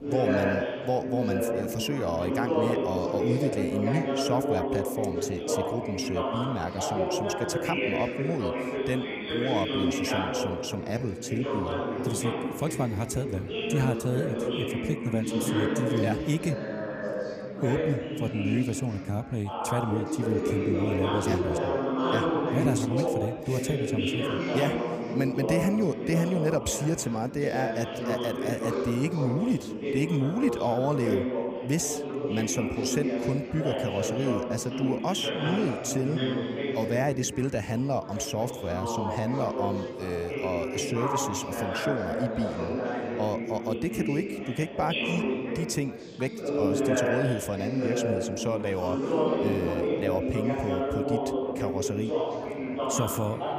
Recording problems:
chatter from many people; very loud; throughout; 1 dB above the speech

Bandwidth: 15 kHz